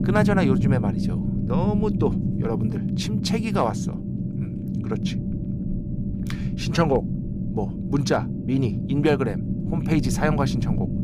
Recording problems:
low rumble; loud; throughout; 7 dB below the speech

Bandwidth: 15 kHz